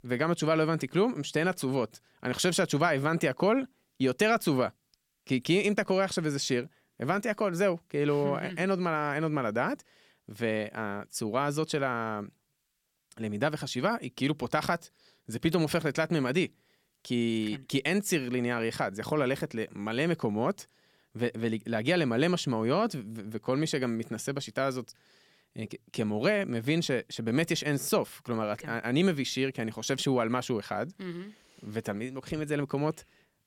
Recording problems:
none

